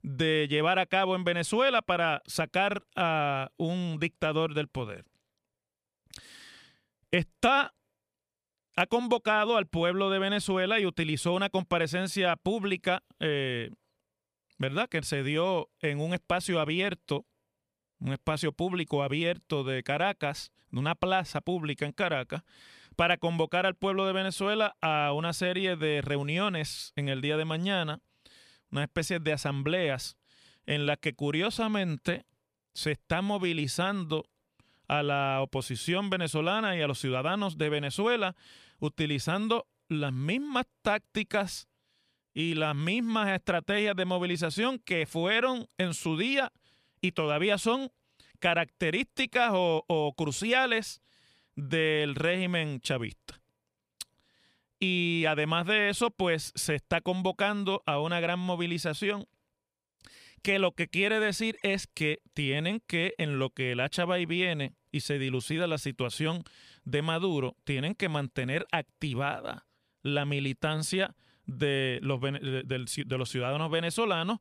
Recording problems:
none

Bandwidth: 15 kHz